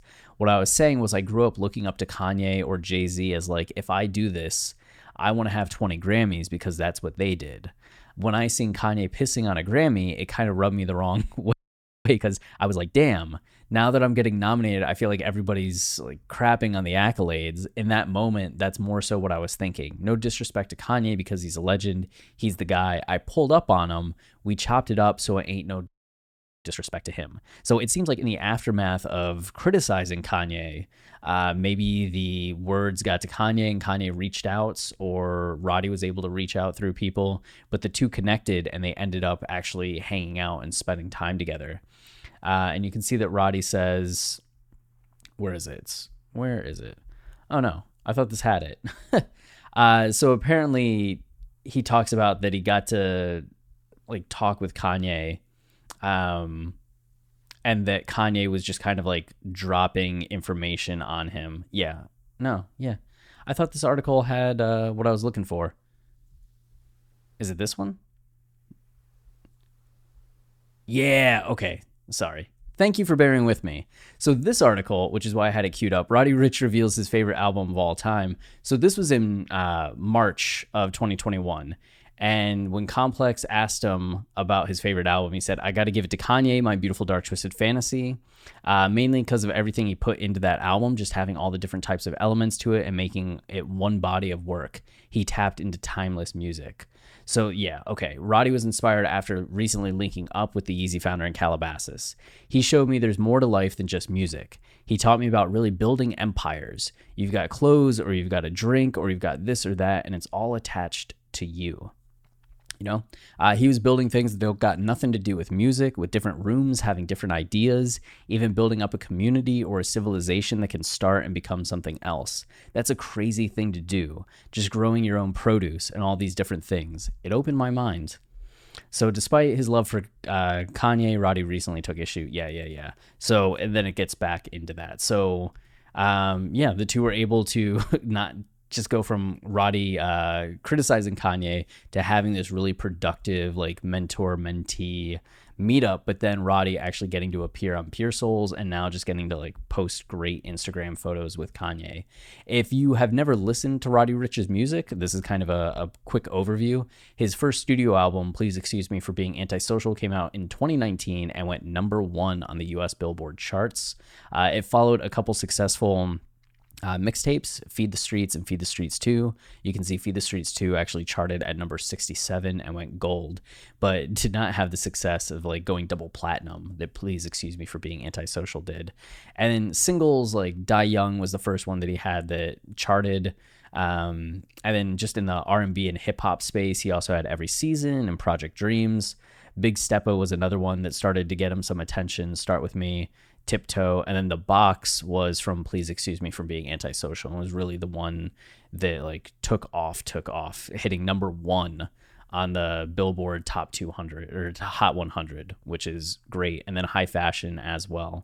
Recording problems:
audio freezing; at 12 s for 0.5 s and at 26 s for 1 s

